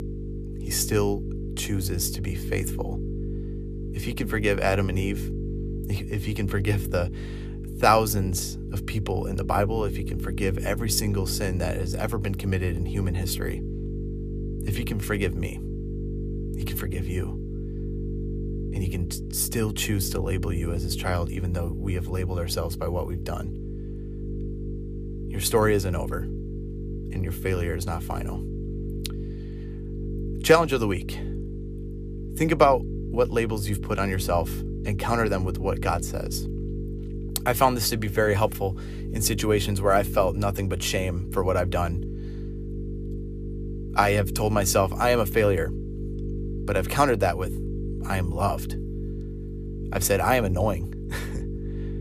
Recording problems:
electrical hum; noticeable; throughout; 50 Hz, 15 dB below the speech

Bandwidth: 14.5 kHz